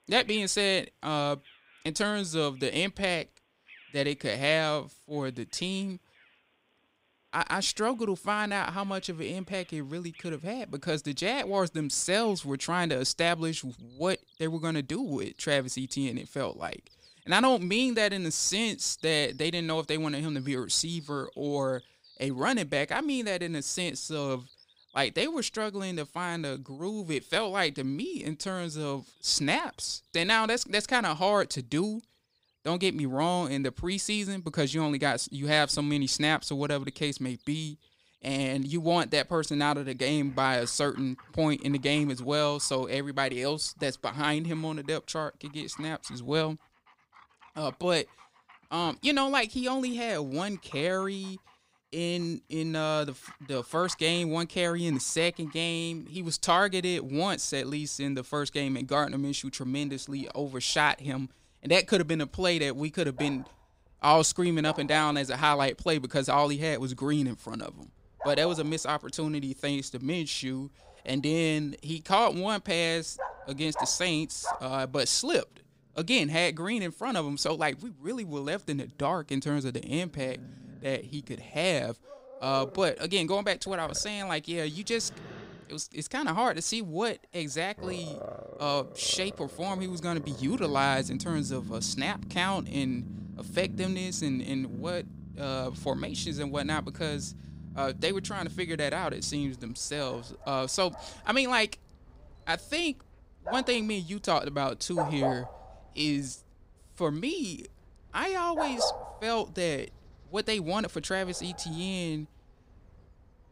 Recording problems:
animal sounds; noticeable; throughout; 15 dB below the speech

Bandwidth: 15.5 kHz